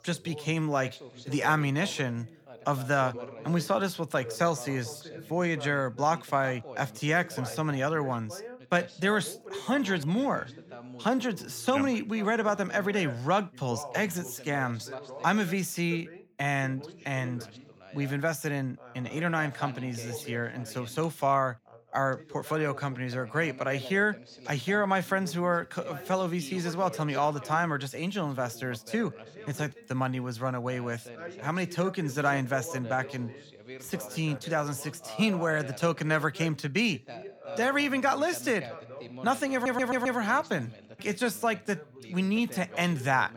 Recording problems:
background chatter; noticeable; throughout; 2 voices, 15 dB below the speech
audio stuttering; at 40 s

